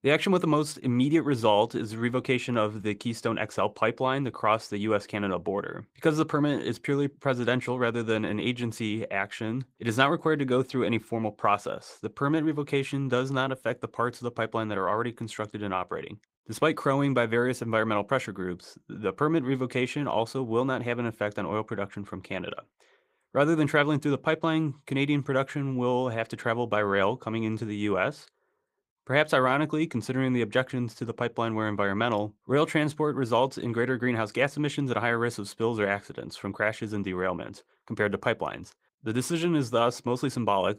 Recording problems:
garbled, watery; slightly; nothing above 15.5 kHz

